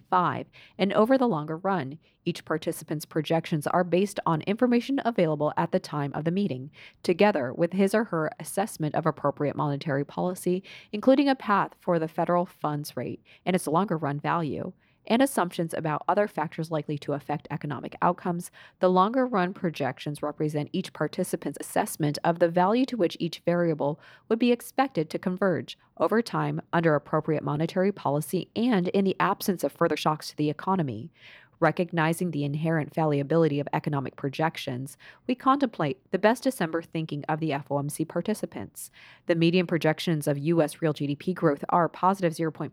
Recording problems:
uneven, jittery; strongly; from 1 to 30 s

